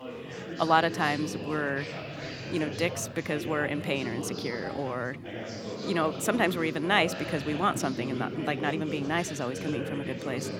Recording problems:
chatter from many people; loud; throughout; 7 dB below the speech

